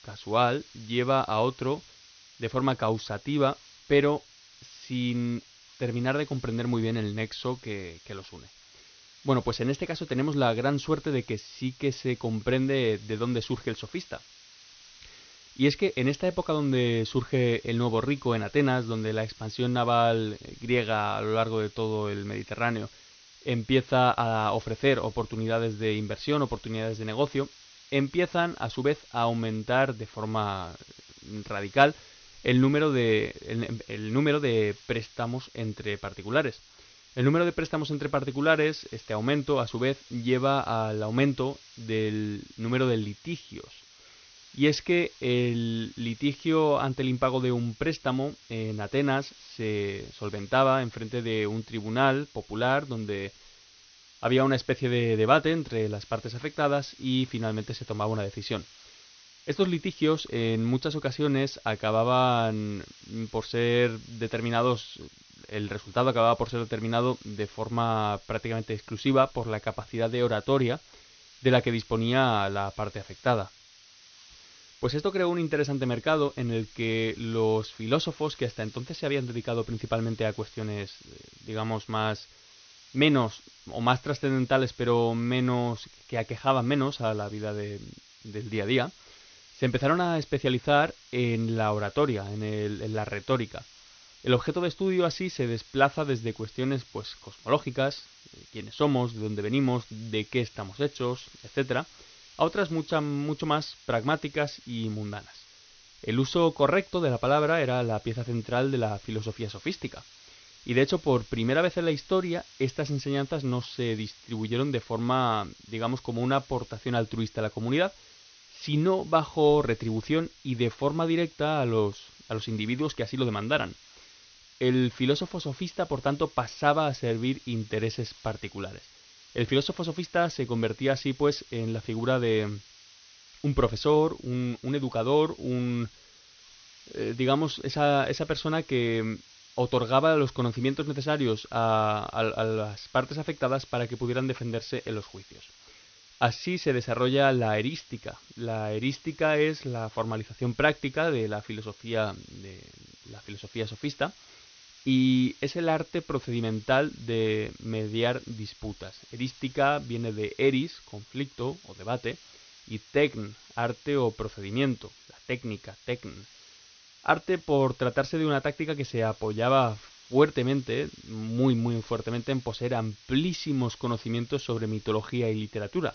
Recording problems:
high frequencies cut off; noticeable; nothing above 6.5 kHz
hiss; faint; throughout; 25 dB below the speech

